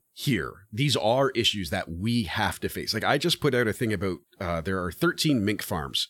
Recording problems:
none

